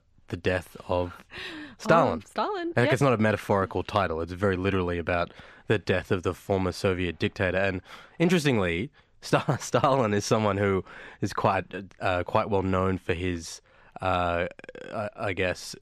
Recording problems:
none

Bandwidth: 14 kHz